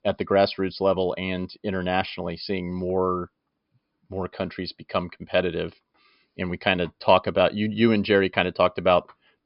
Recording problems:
high frequencies cut off; noticeable; nothing above 5.5 kHz

